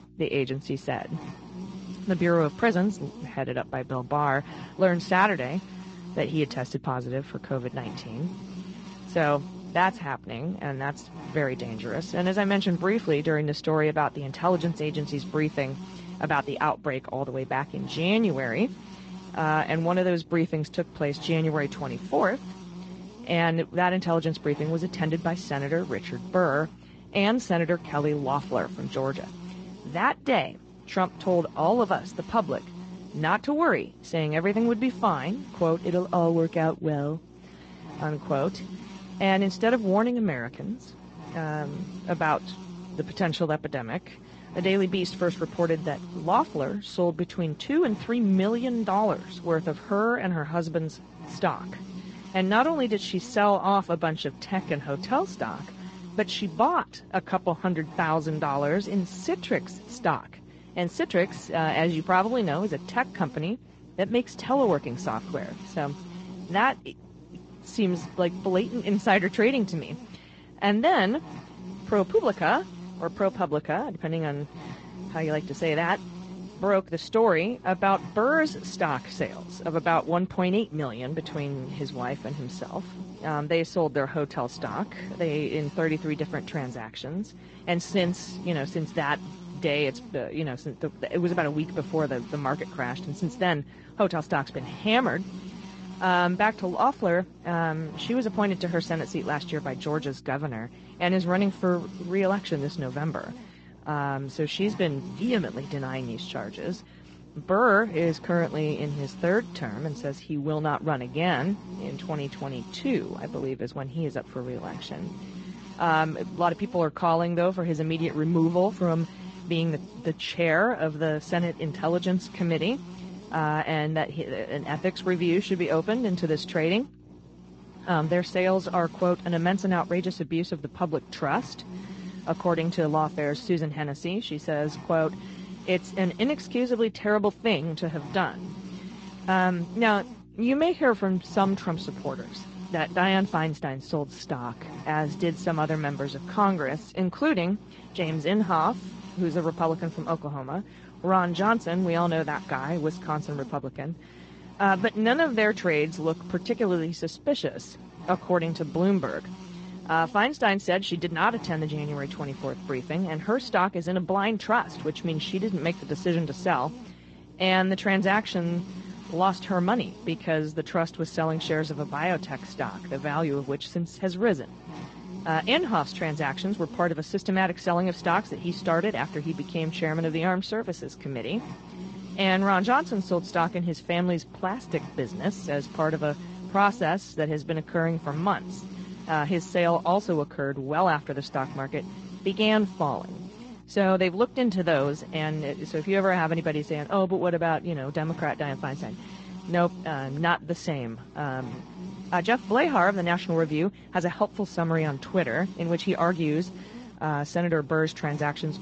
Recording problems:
garbled, watery; slightly; nothing above 7.5 kHz
electrical hum; noticeable; throughout; 60 Hz, 20 dB below the speech

